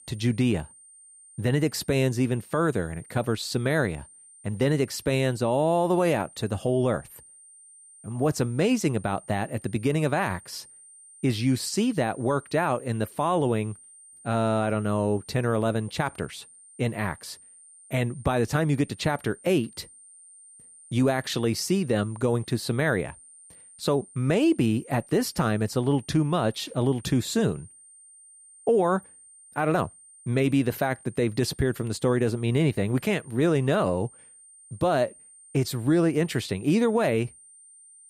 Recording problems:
high-pitched whine; faint; throughout; 9 kHz, 20 dB below the speech

